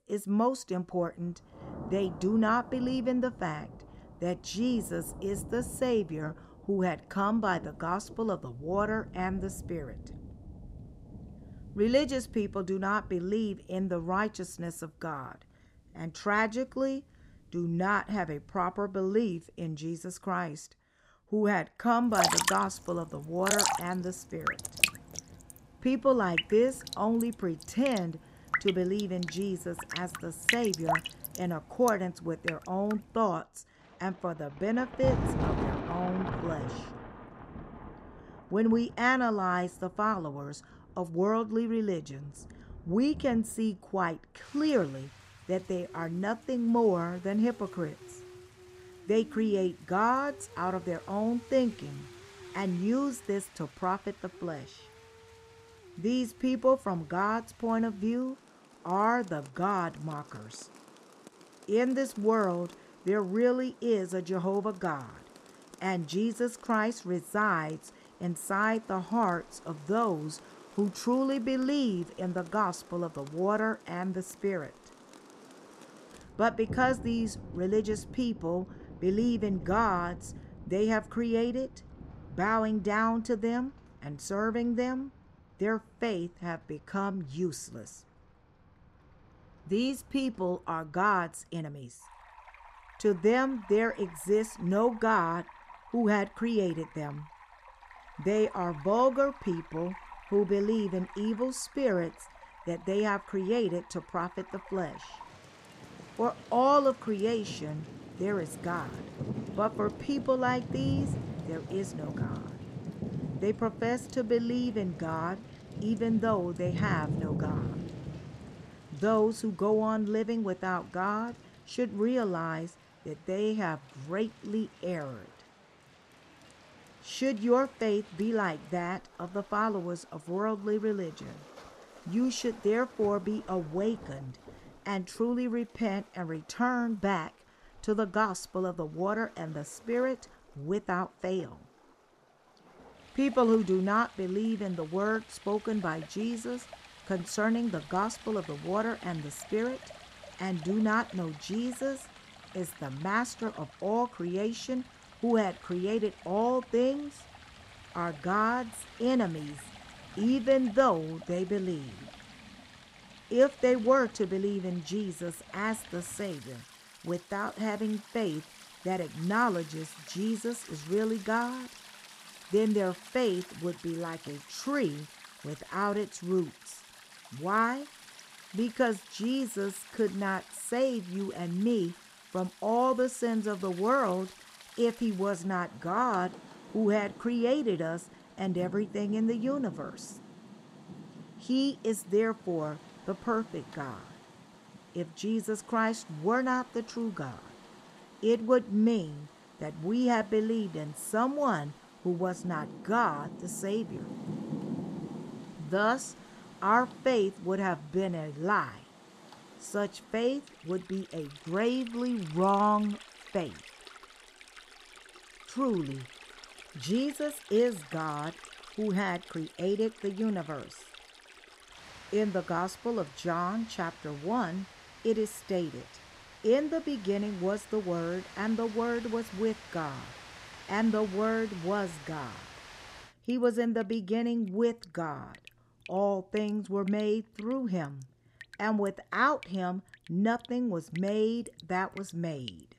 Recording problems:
rain or running water; noticeable; throughout; 10 dB below the speech

